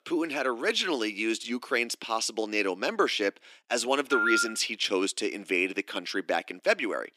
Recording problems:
thin; very slightly; fading below 300 Hz
phone ringing; loud; at 4 s; peak 3 dB above the speech

